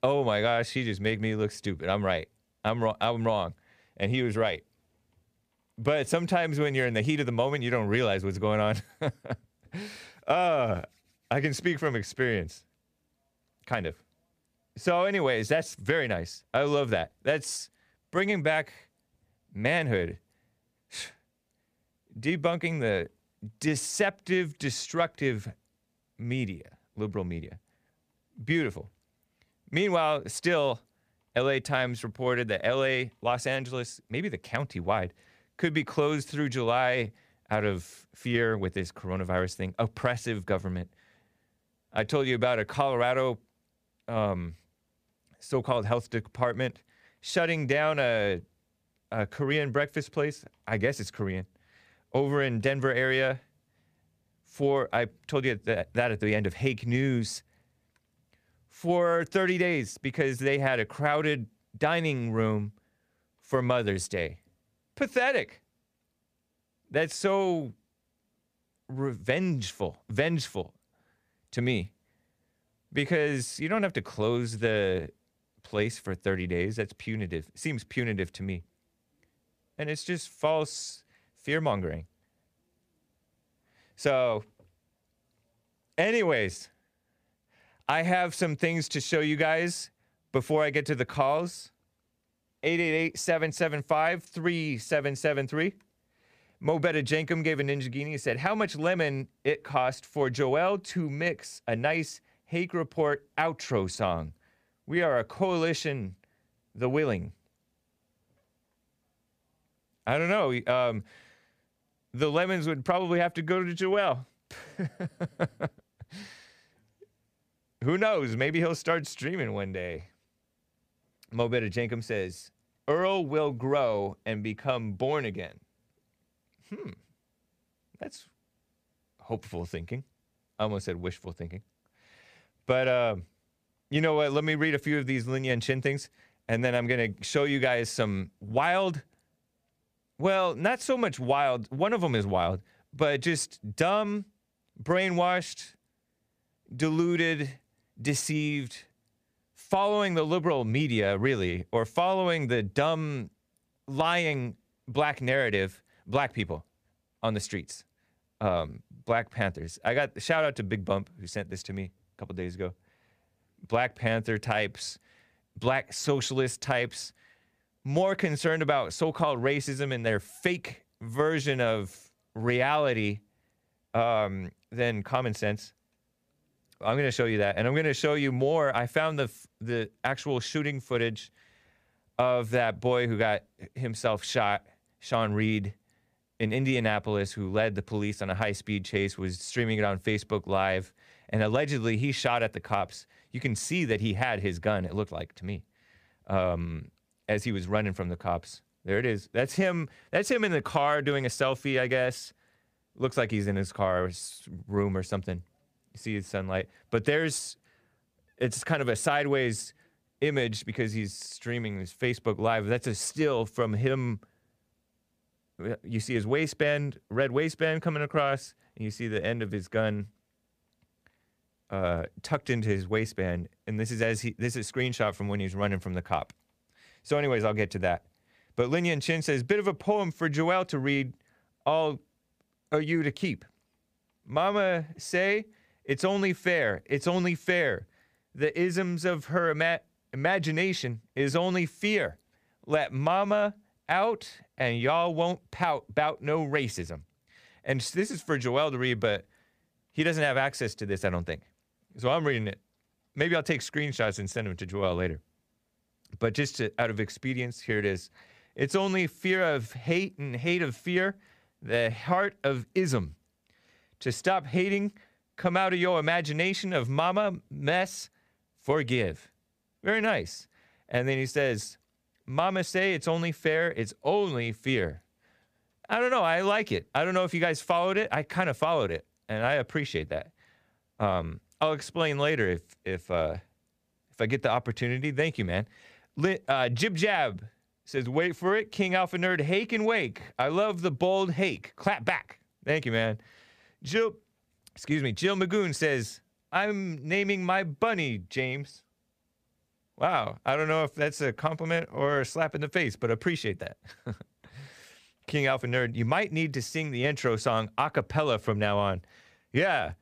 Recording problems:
none

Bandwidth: 15 kHz